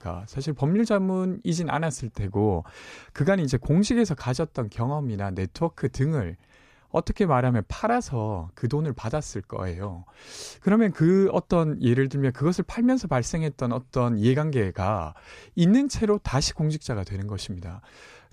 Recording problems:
none

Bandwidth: 14.5 kHz